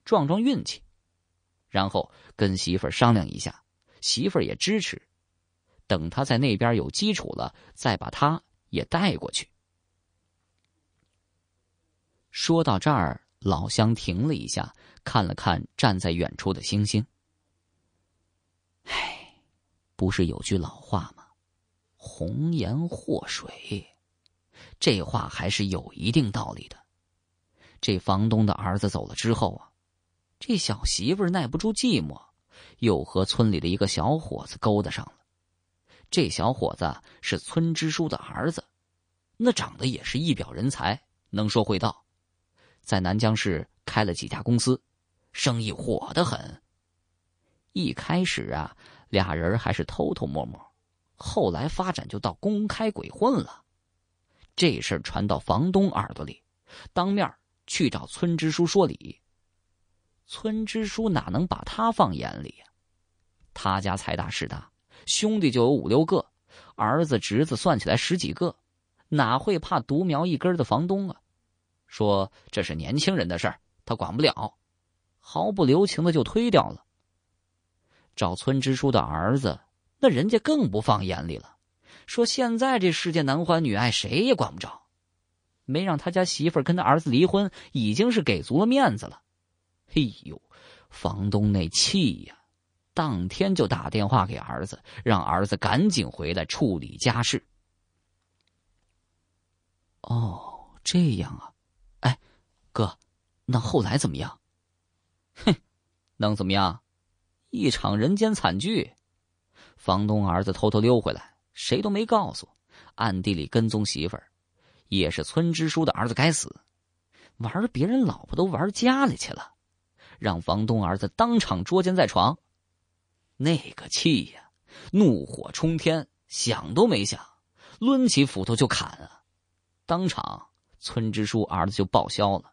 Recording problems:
garbled, watery; slightly; nothing above 9 kHz

